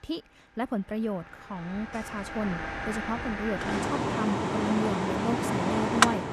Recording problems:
machinery noise; very loud; throughout; 3 dB above the speech

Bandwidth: 13.5 kHz